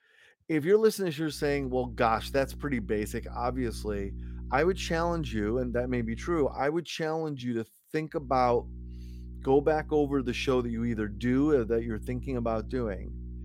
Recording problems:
electrical hum; faint; from 1.5 to 6.5 s and from 8 s on; 60 Hz, 25 dB below the speech

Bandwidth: 16 kHz